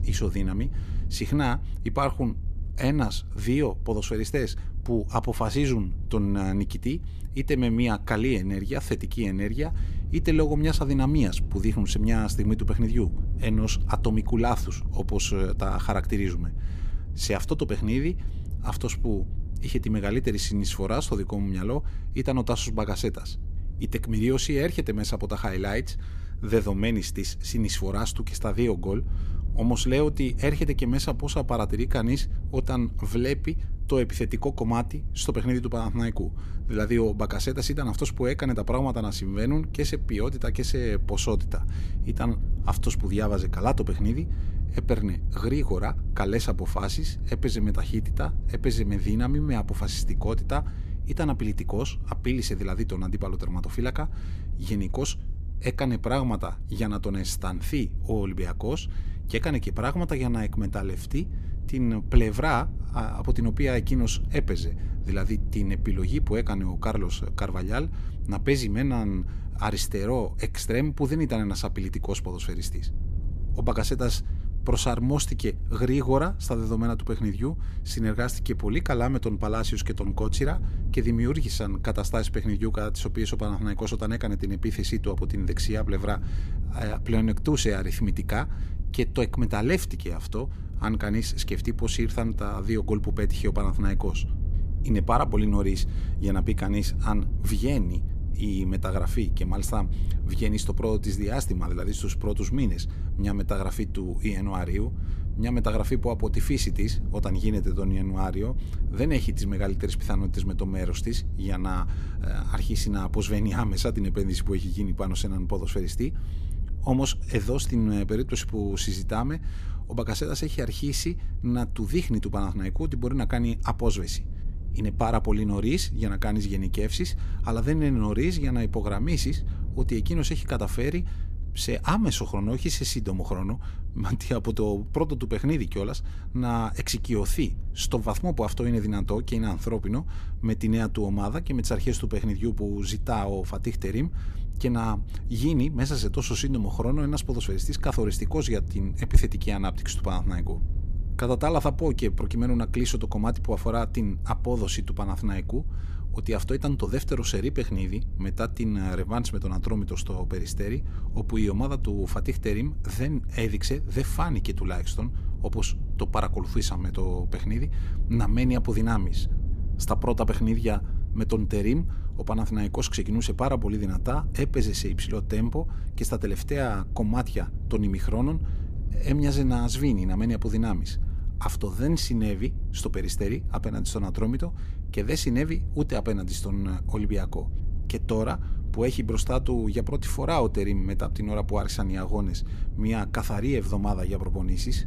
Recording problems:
low rumble; noticeable; throughout; 15 dB below the speech

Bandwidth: 14.5 kHz